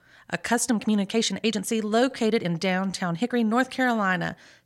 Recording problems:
uneven, jittery; strongly; from 0.5 to 4 s

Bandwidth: 16 kHz